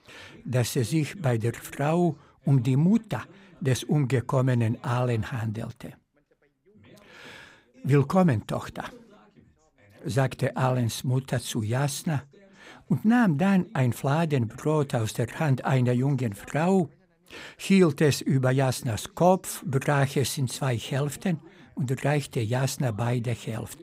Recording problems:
background chatter; faint; throughout; 2 voices, 30 dB below the speech

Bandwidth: 15.5 kHz